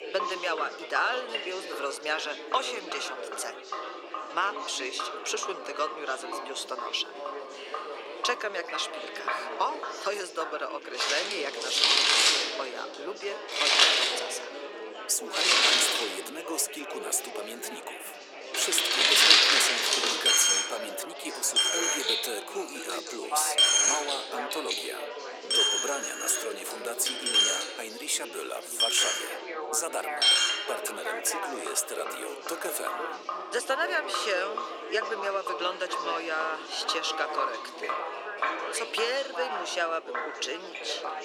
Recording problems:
thin; very; fading below 350 Hz
household noises; very loud; throughout; 7 dB above the speech
chatter from many people; loud; throughout; 6 dB below the speech

